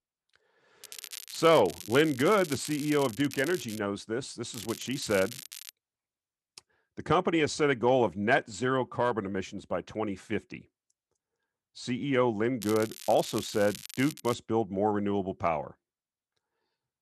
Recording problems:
crackling; noticeable; from 1 to 4 s, from 4.5 to 5.5 s and from 13 to 14 s; 15 dB below the speech

